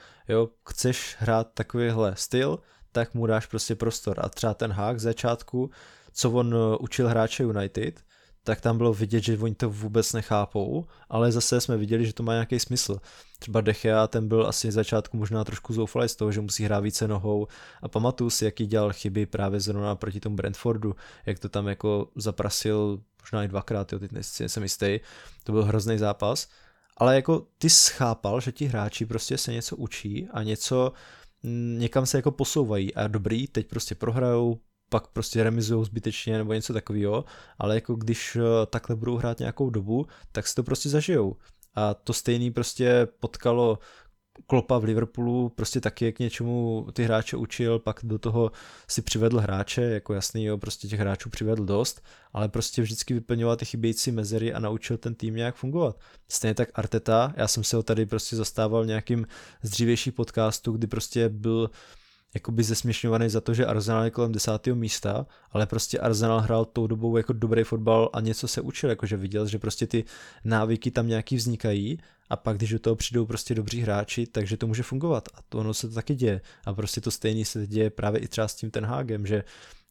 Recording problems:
none

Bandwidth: 18.5 kHz